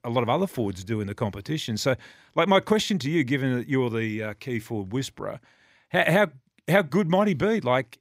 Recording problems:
none

